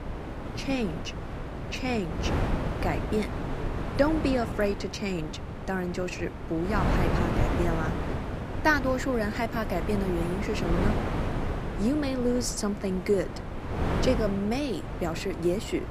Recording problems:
wind noise on the microphone; heavy; 5 dB below the speech

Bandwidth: 14.5 kHz